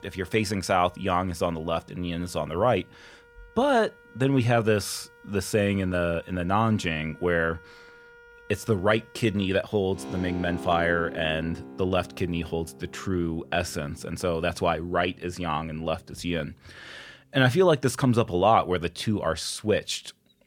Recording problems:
background music; noticeable; throughout; 20 dB below the speech

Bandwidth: 17 kHz